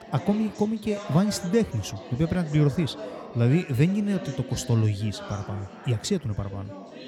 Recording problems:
background chatter; noticeable; throughout; 4 voices, 15 dB below the speech

